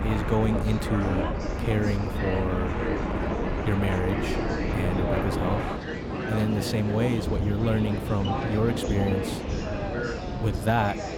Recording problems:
train or aircraft noise; loud; throughout; 3 dB below the speech
chatter from many people; loud; throughout; 6 dB below the speech

